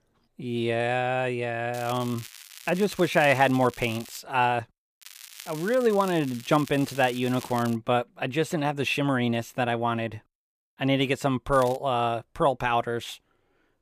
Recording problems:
crackling; noticeable; from 1.5 to 4 s, from 5 to 8 s and at 12 s; 20 dB below the speech

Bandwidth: 15 kHz